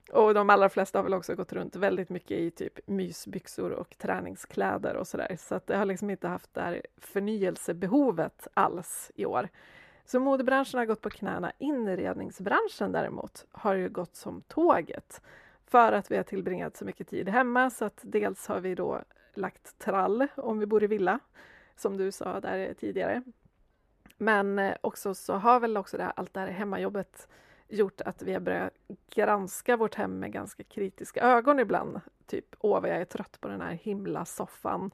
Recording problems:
muffled; slightly; fading above 2.5 kHz

